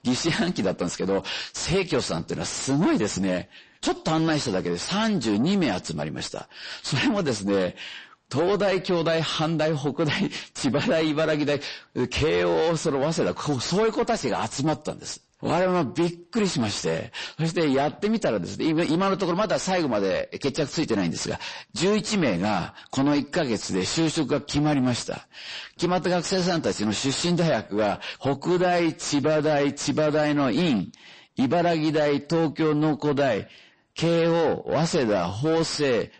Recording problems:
distortion; heavy; 7 dB below the speech
garbled, watery; slightly; nothing above 8 kHz

